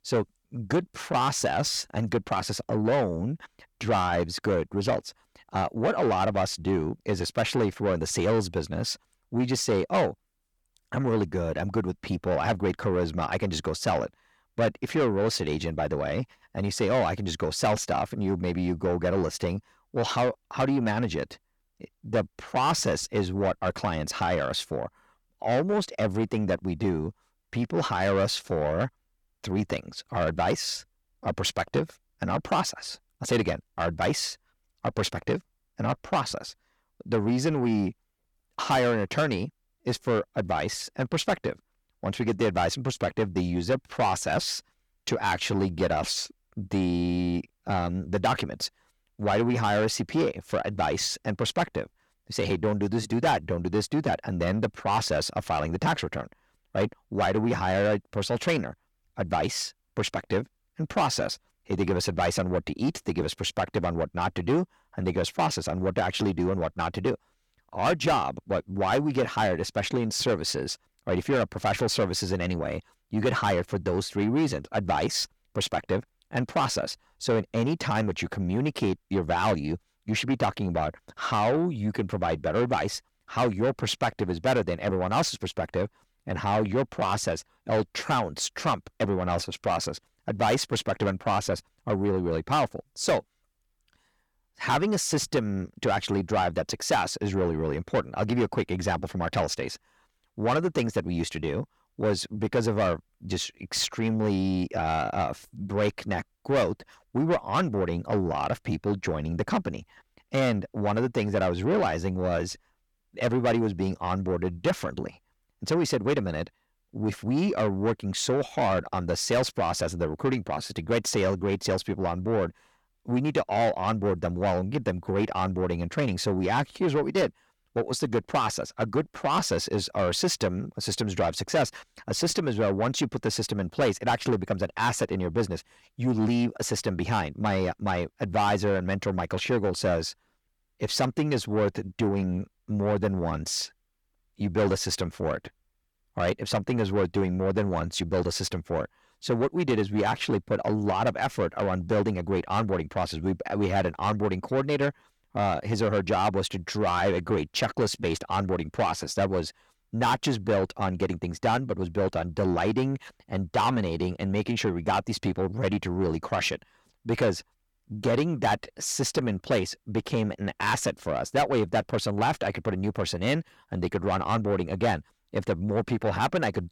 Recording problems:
distortion; heavy; 8 dB below the speech

